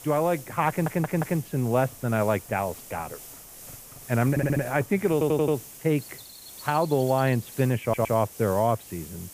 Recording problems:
muffled; very; fading above 3 kHz
hiss; noticeable; throughout; 15 dB below the speech
animal sounds; faint; throughout; 25 dB below the speech
audio stuttering; 4 times, first at 0.5 s

